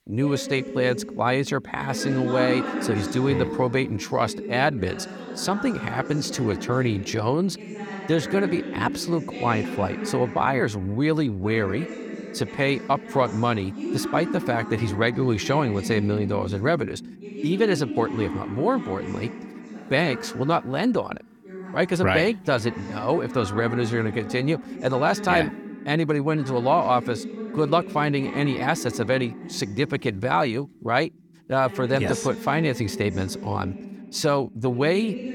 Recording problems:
voice in the background; loud; throughout; 9 dB below the speech

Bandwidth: 18 kHz